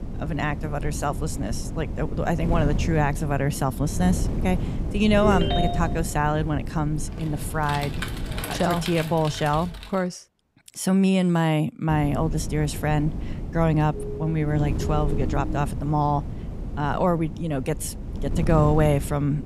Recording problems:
wind noise on the microphone; occasional gusts; until 8.5 s and from 12 s on; 15 dB below the speech
phone ringing; noticeable; at 5 s; peak 1 dB below the speech
keyboard typing; noticeable; from 7 to 10 s; peak 6 dB below the speech
siren; noticeable; from 14 to 16 s; peak 10 dB below the speech

